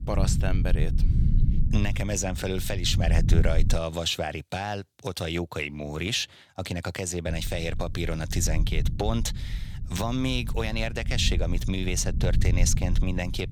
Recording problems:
low rumble; noticeable; until 4 s and from 7.5 s on; 15 dB below the speech

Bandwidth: 18.5 kHz